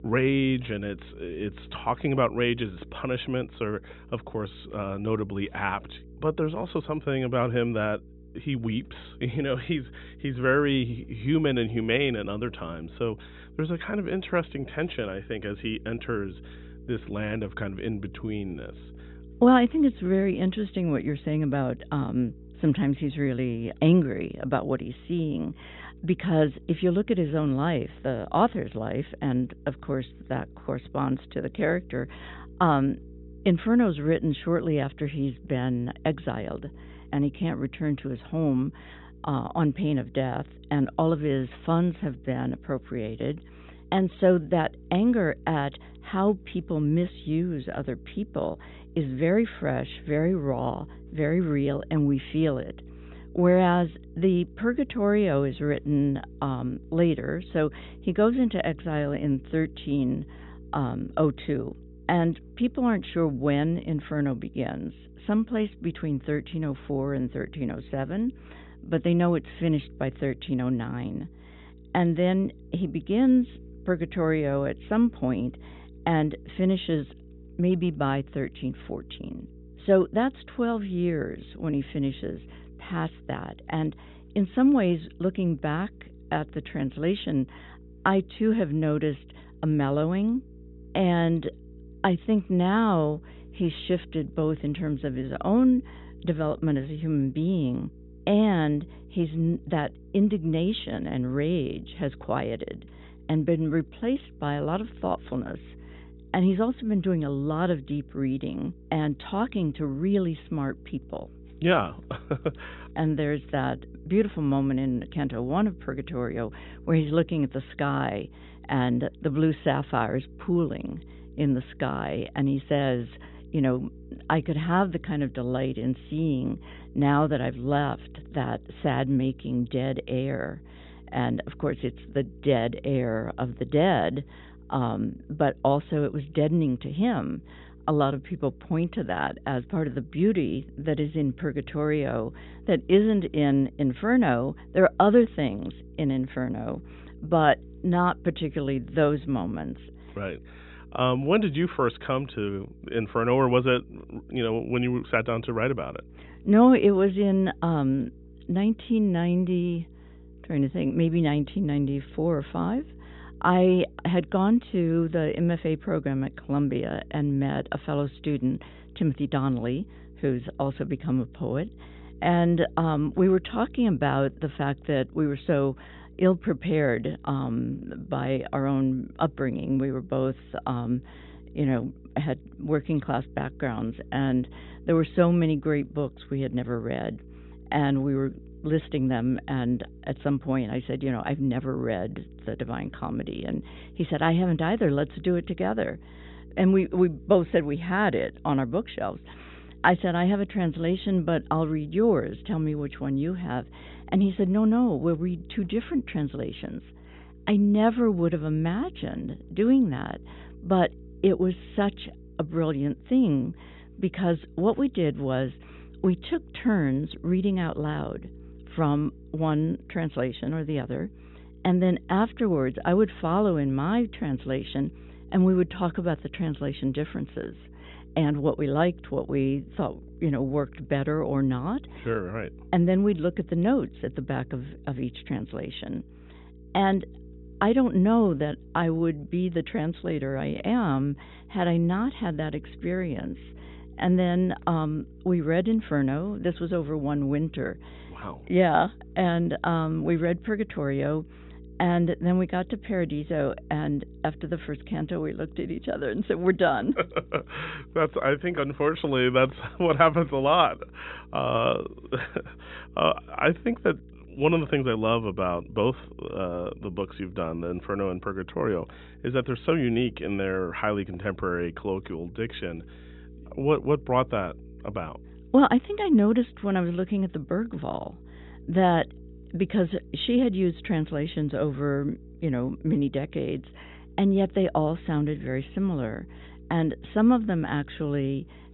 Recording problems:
high frequencies cut off; severe; nothing above 4 kHz
electrical hum; faint; throughout; 60 Hz, 25 dB below the speech

